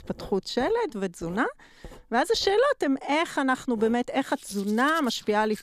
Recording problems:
household noises; faint; throughout; 20 dB below the speech

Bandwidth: 14.5 kHz